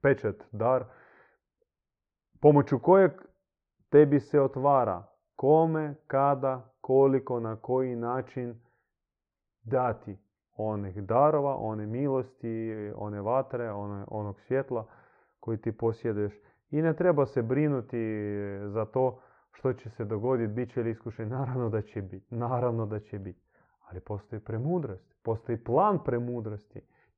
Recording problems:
muffled; very; fading above 1.5 kHz

